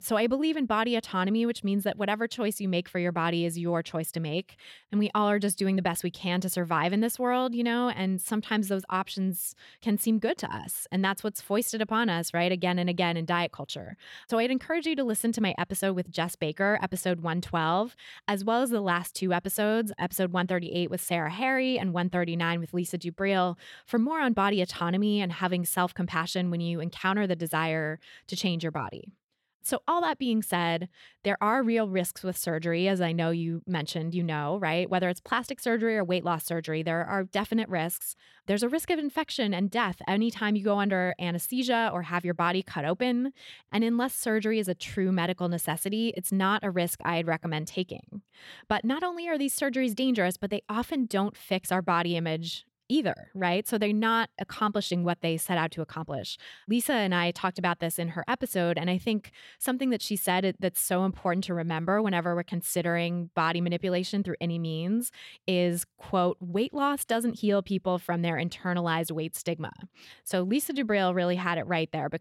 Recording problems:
none

